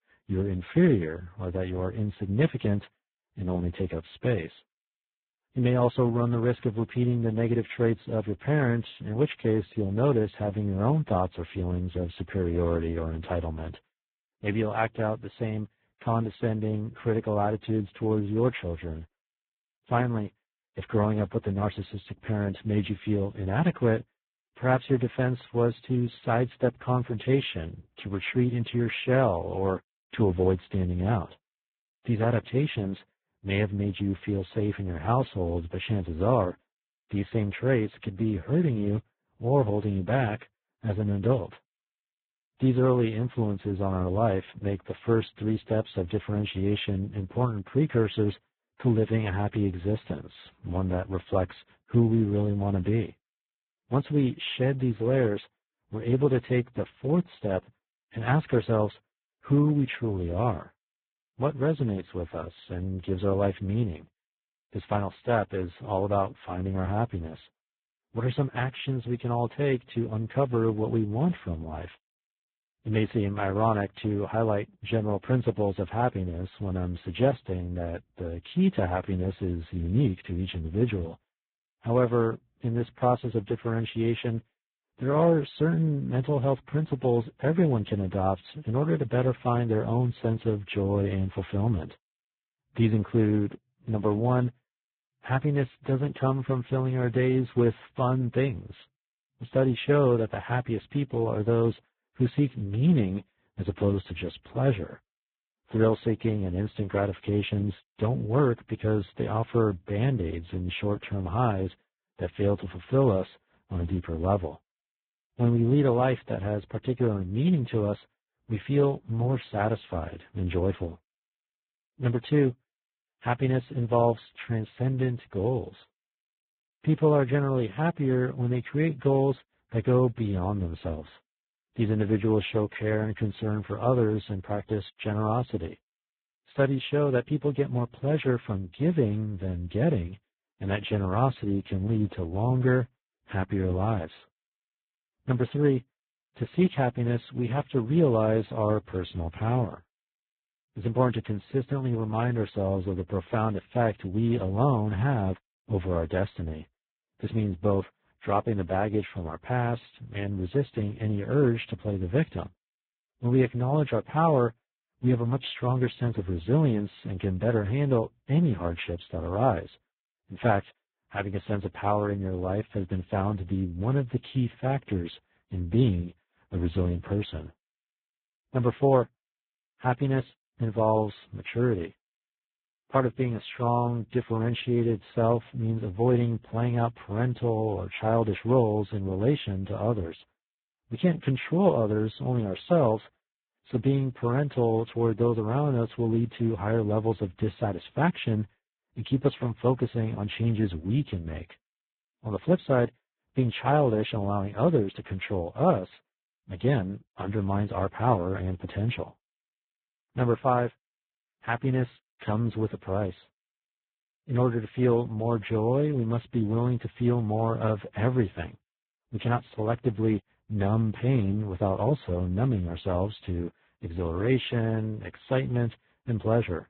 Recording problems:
garbled, watery; badly
high frequencies cut off; severe; nothing above 4 kHz

